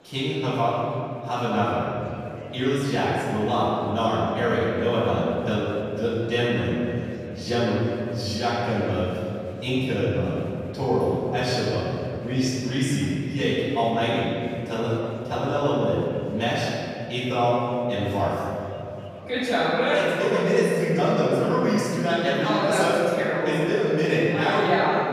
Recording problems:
room echo; strong; dies away in 2.9 s
off-mic speech; far
murmuring crowd; faint; throughout; 25 dB below the speech

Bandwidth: 14.5 kHz